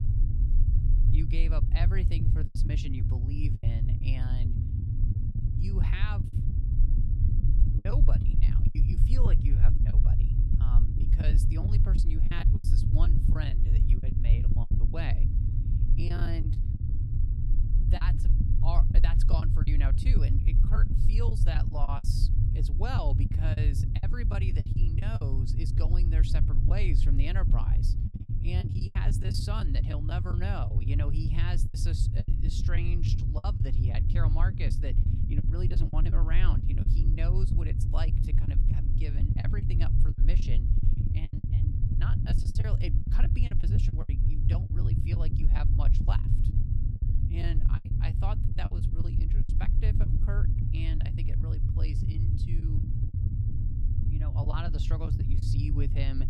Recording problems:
low rumble; loud; throughout; 2 dB below the speech
choppy; very; 10% of the speech affected

